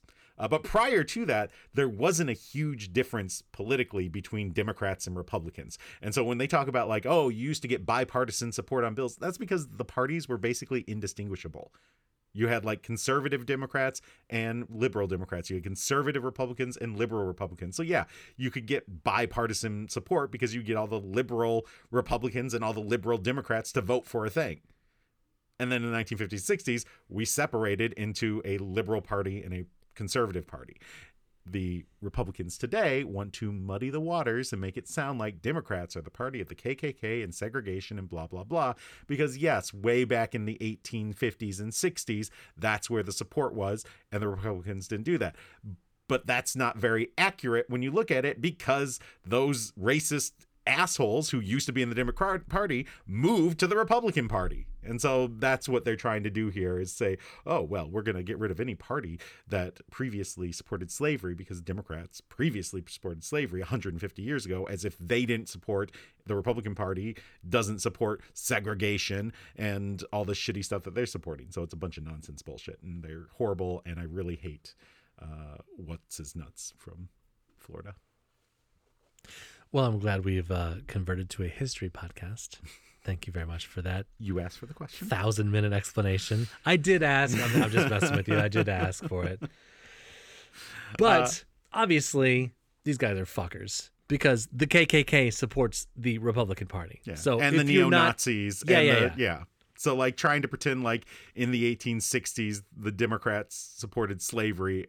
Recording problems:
none

